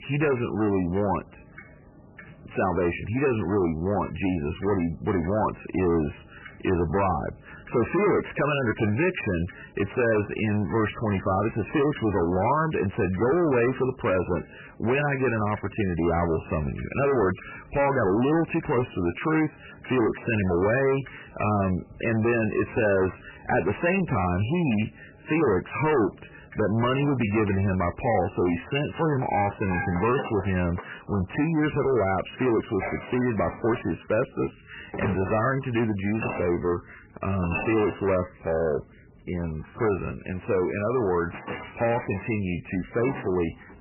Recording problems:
distortion; heavy; 7 dB below the speech
garbled, watery; badly; nothing above 3 kHz
household noises; noticeable; throughout; 15 dB below the speech

